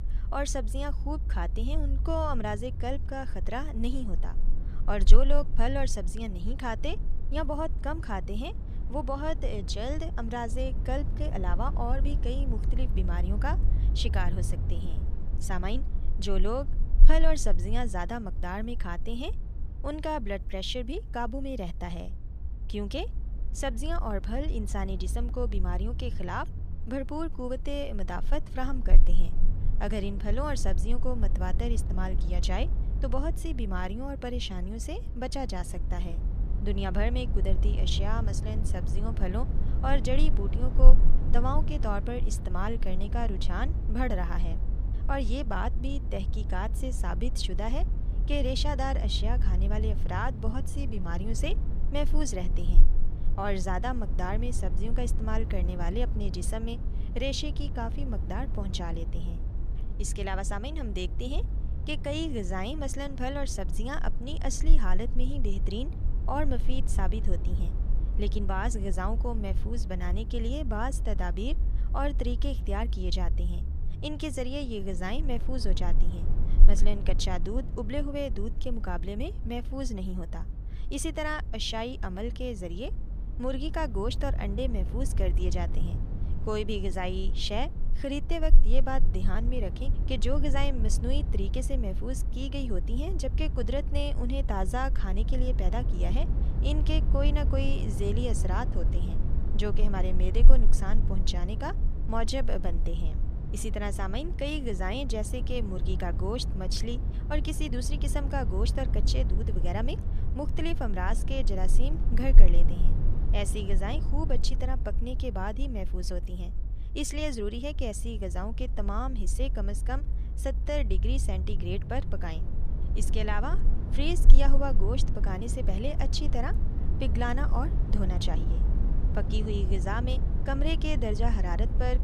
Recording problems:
low rumble; noticeable; throughout; 10 dB below the speech

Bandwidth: 14.5 kHz